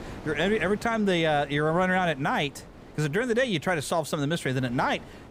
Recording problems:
wind noise on the microphone; occasional gusts; 20 dB below the speech

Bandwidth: 15.5 kHz